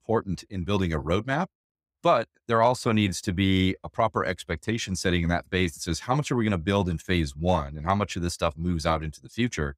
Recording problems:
none

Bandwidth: 15.5 kHz